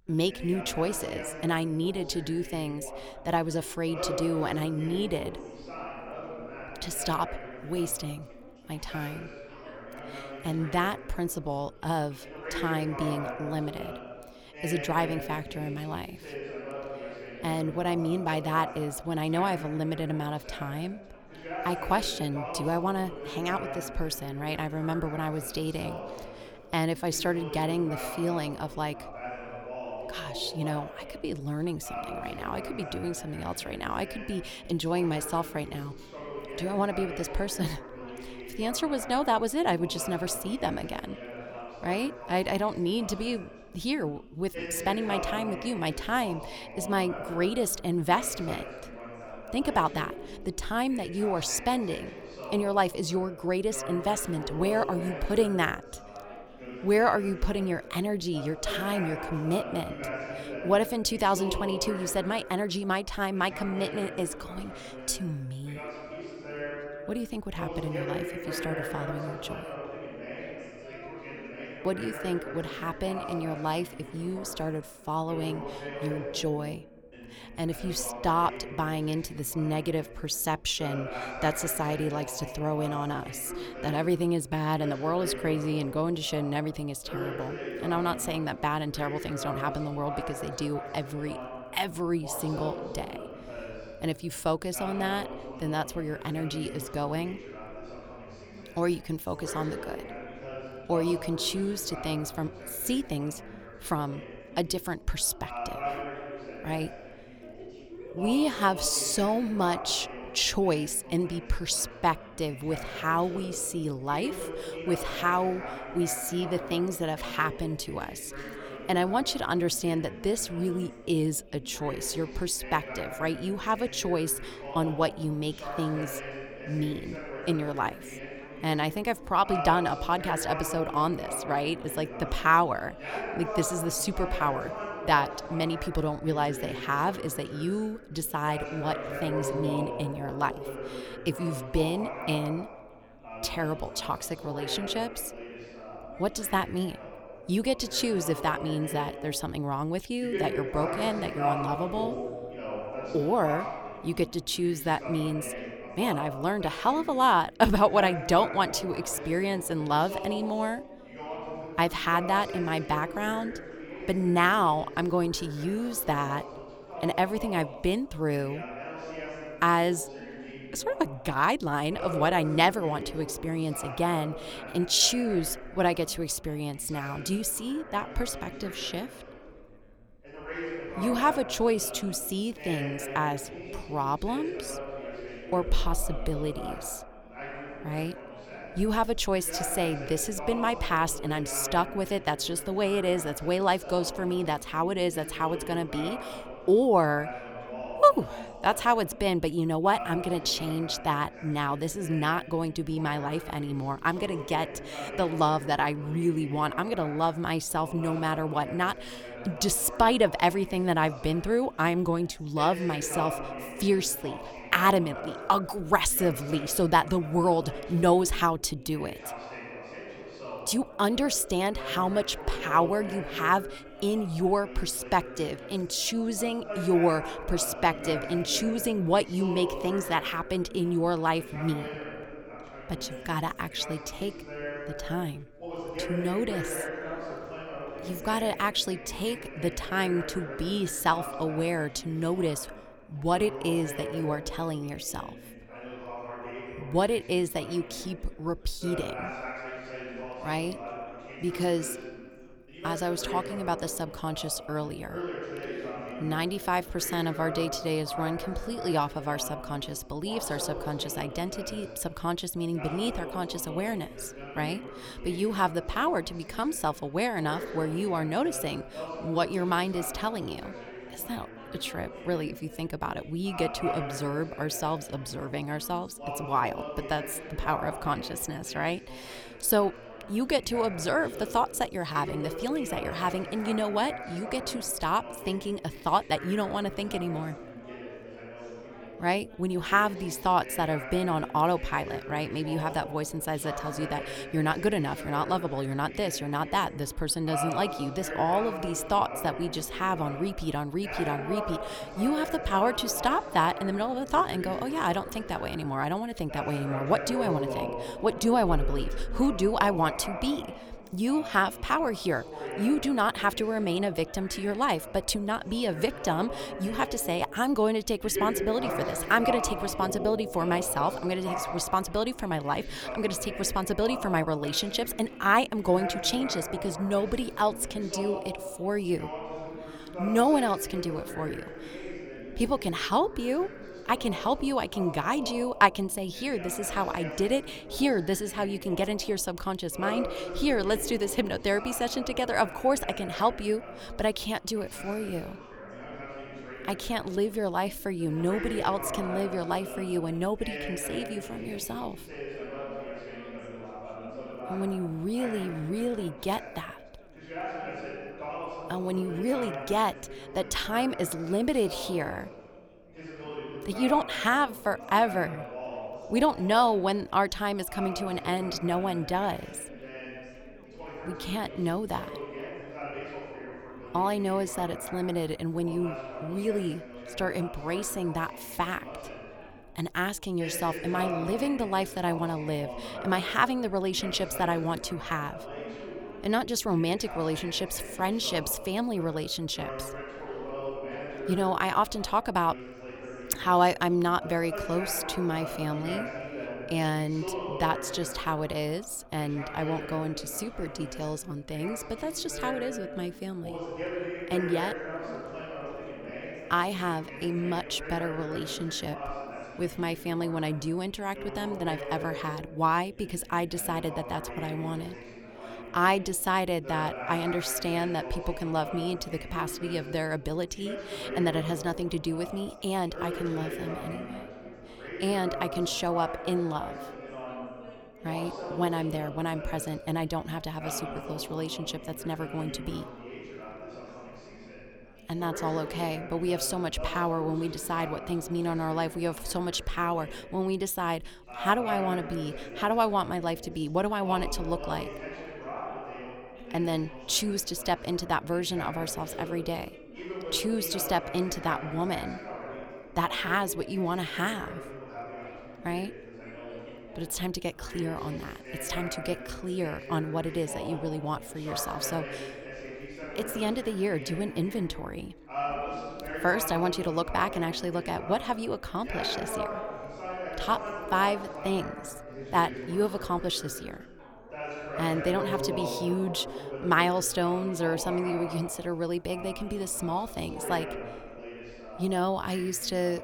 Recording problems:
background chatter; loud; throughout; 3 voices, 10 dB below the speech

